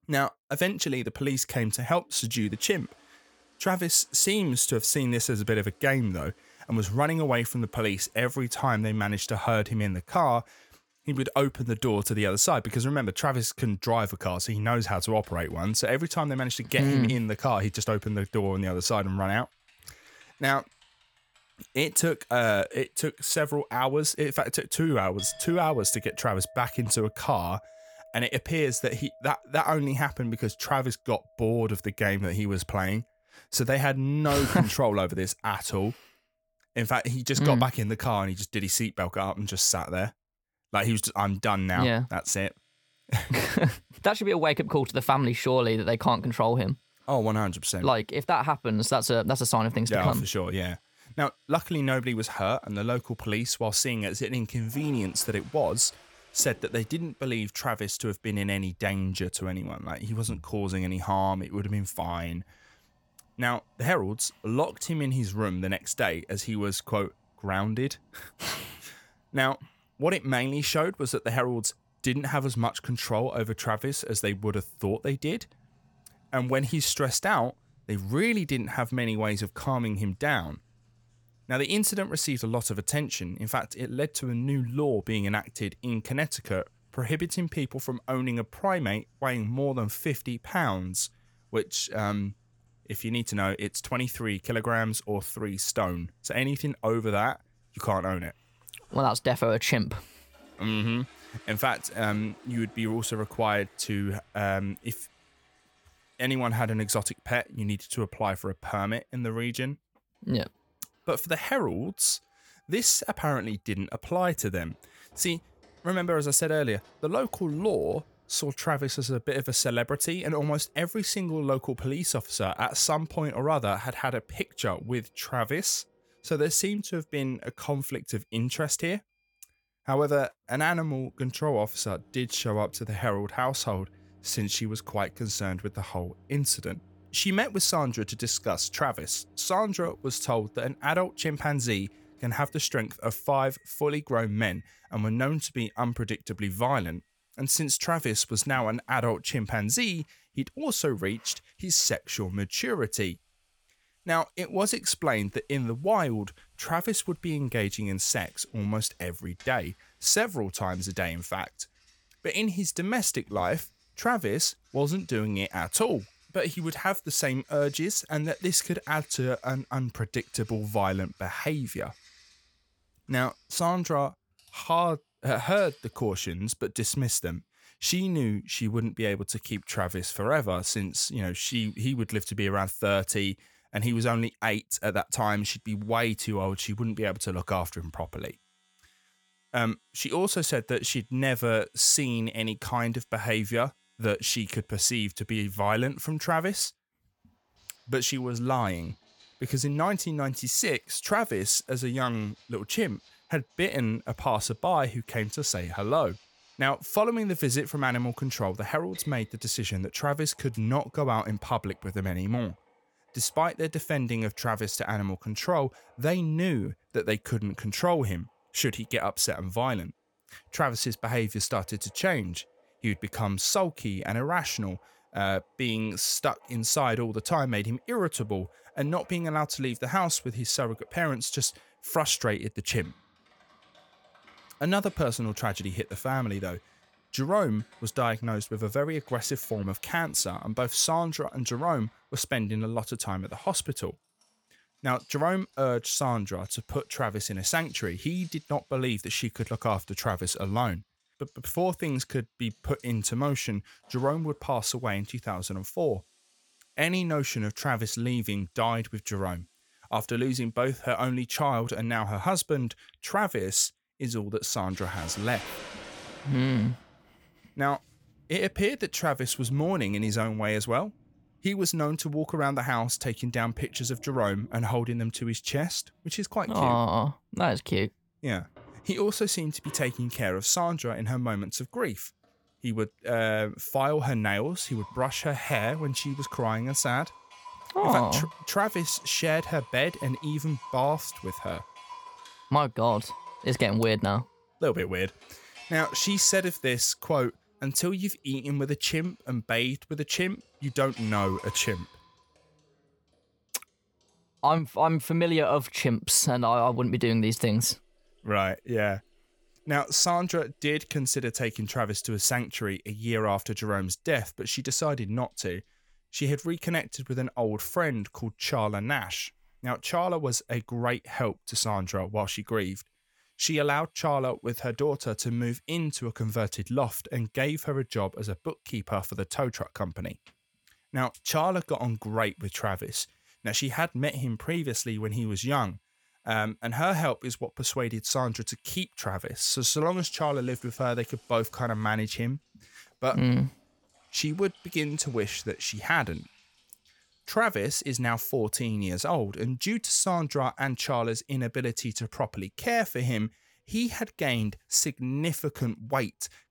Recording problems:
household noises; faint; throughout; 25 dB below the speech

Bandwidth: 18 kHz